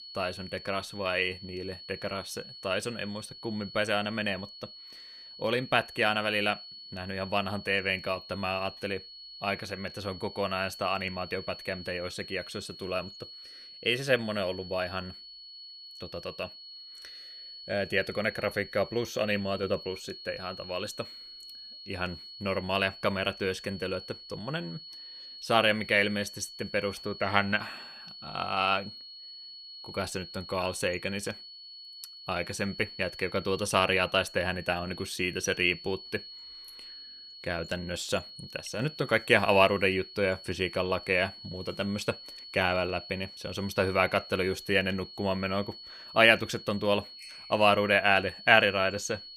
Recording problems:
high-pitched whine; noticeable; throughout; 4.5 kHz, 15 dB below the speech

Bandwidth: 15 kHz